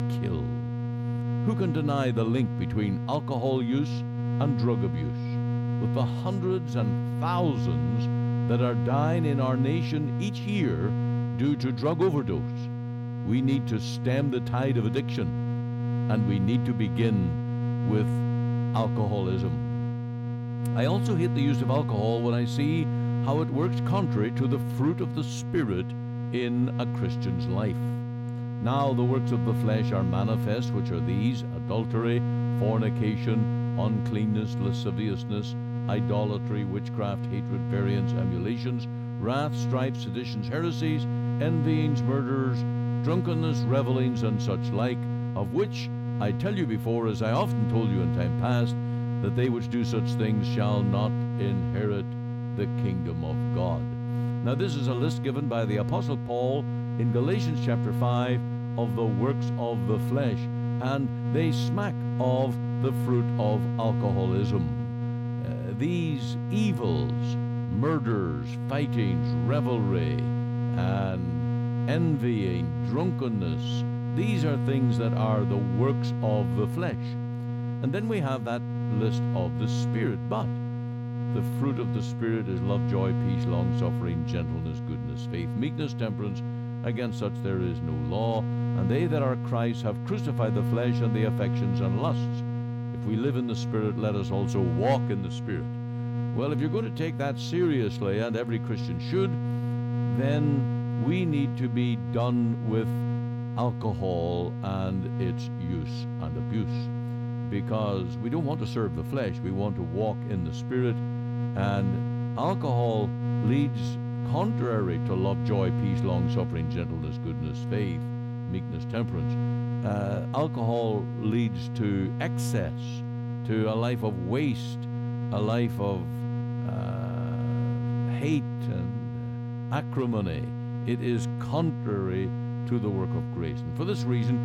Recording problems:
electrical hum; loud; throughout; 60 Hz, 5 dB below the speech

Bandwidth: 16 kHz